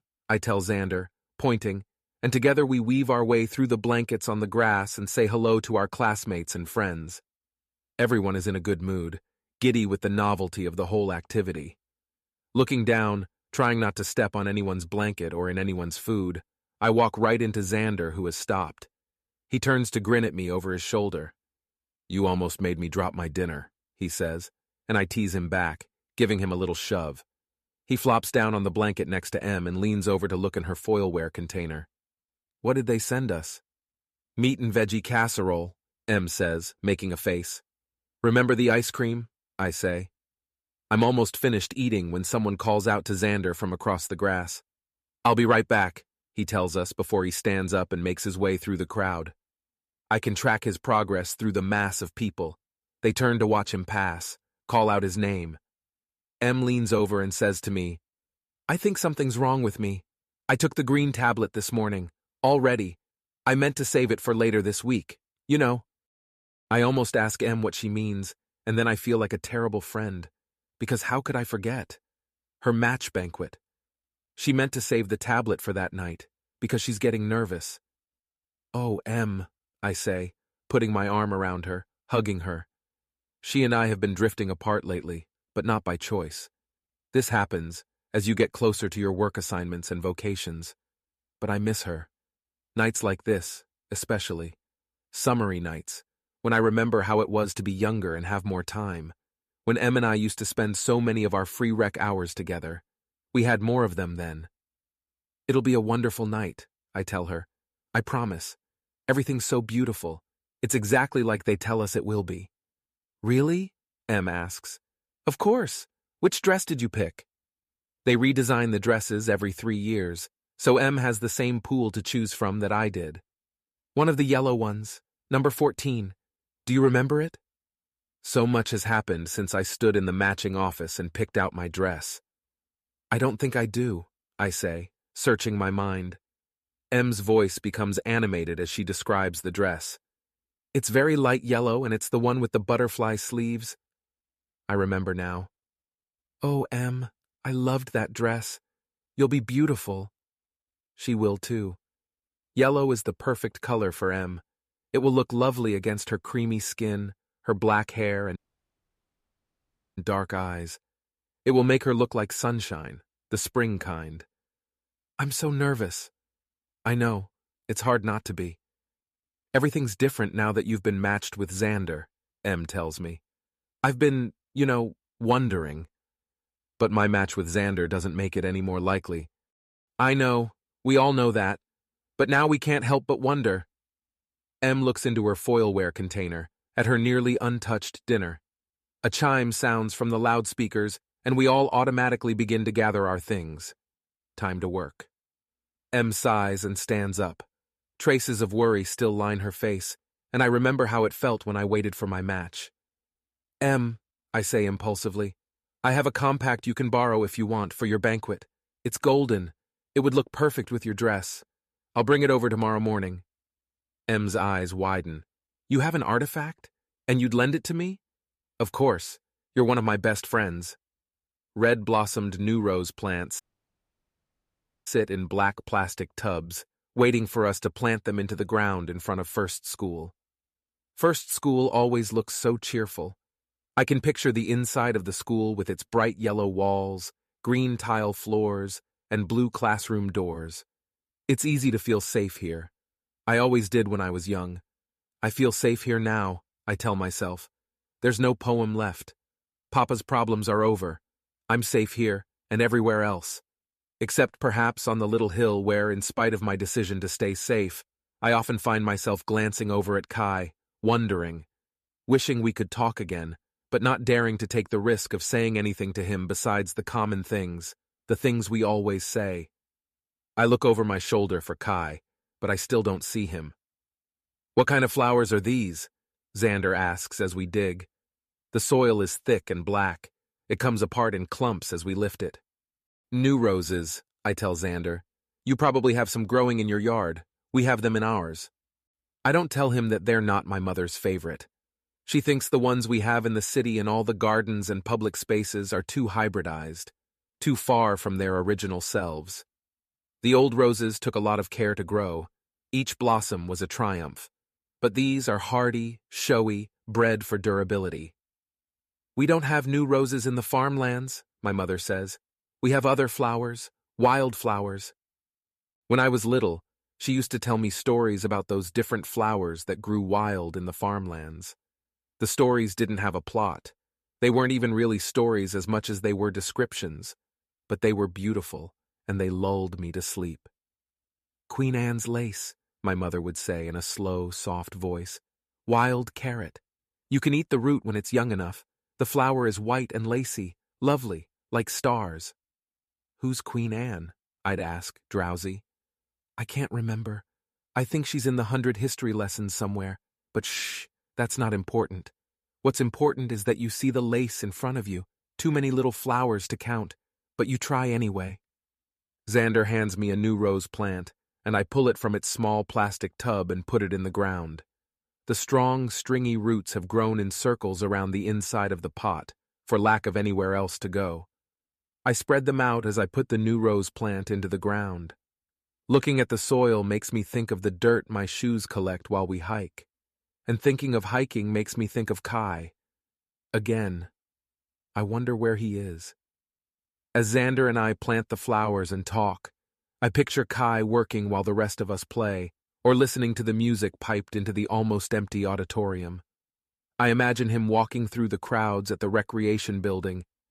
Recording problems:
audio cutting out; at 2:38 for 1.5 s and at 3:43 for 1.5 s

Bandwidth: 14.5 kHz